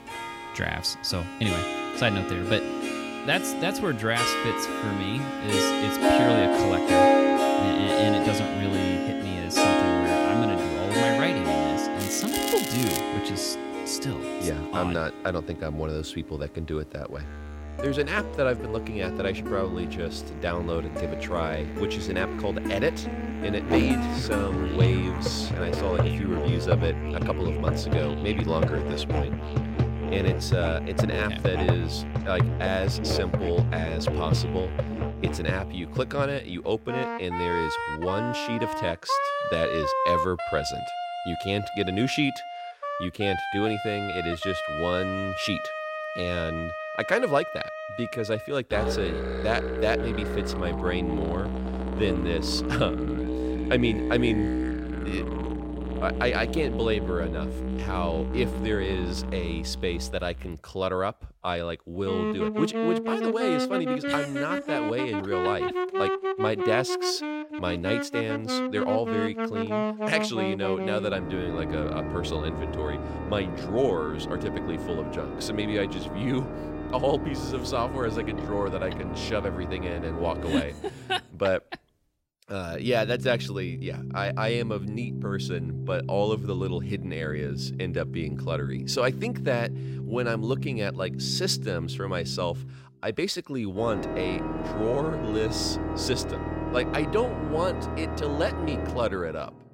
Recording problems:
background music; very loud; throughout; as loud as the speech
crackling; loud; from 12 to 13 s; 2 dB below the speech

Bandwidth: 16 kHz